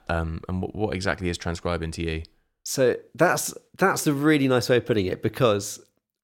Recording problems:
none

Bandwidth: 16.5 kHz